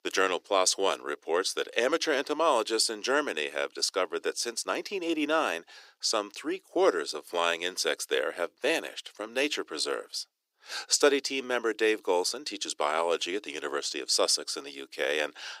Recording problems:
thin; somewhat; fading below 350 Hz

